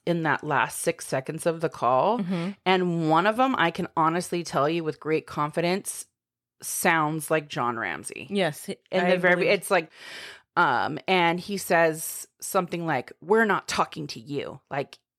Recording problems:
none

